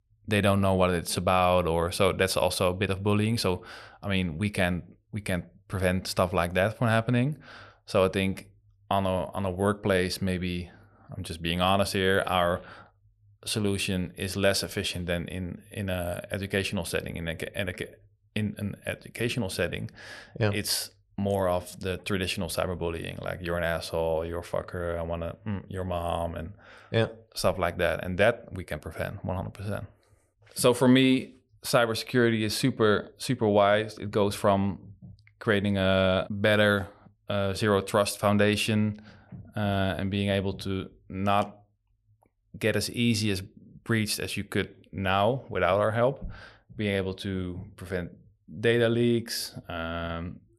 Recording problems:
none

